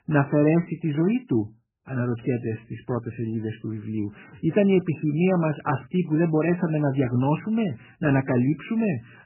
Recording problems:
garbled, watery; badly; nothing above 3 kHz

